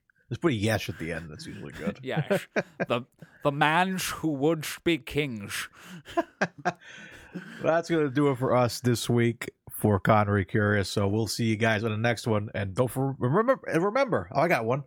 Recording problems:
none

